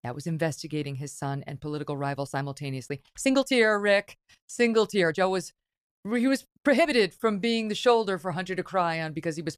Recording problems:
uneven, jittery; strongly; from 2 to 7.5 s

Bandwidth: 14.5 kHz